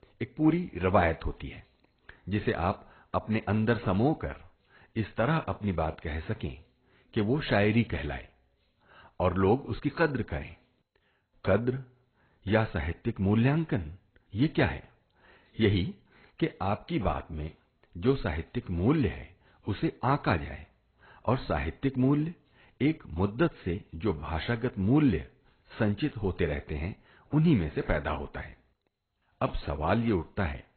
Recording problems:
garbled, watery; badly; nothing above 4 kHz

